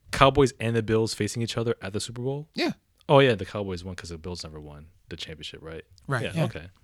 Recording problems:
none

